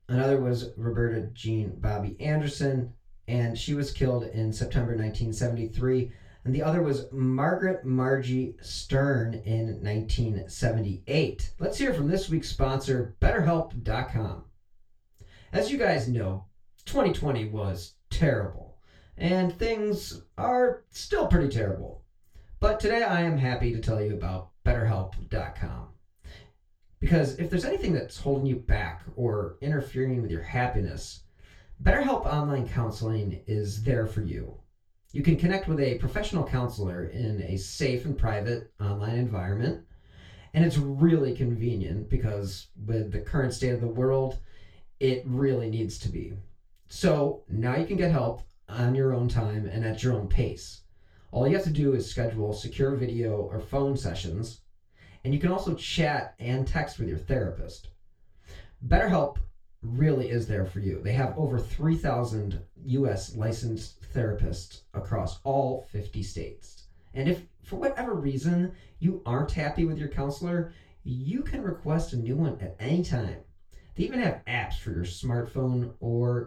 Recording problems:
off-mic speech; far
room echo; slight; dies away in 0.2 s

